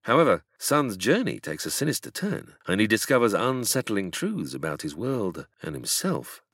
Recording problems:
none

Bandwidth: 16 kHz